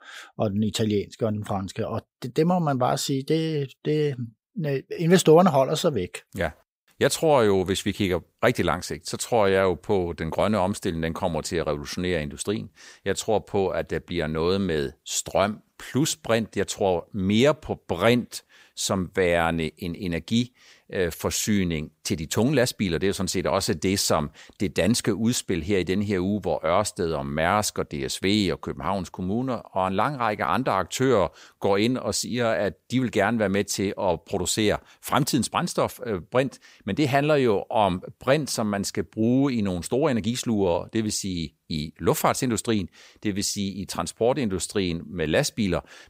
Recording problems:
none

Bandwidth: 15.5 kHz